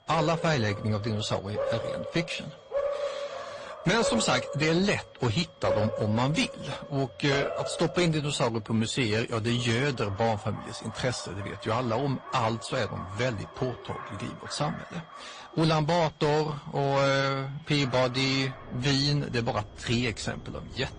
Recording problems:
distortion; slight; 8% of the sound clipped
garbled, watery; slightly; nothing above 8 kHz
animal sounds; loud; throughout; 9 dB below the speech
high-pitched whine; faint; throughout; 3.5 kHz, 35 dB below the speech

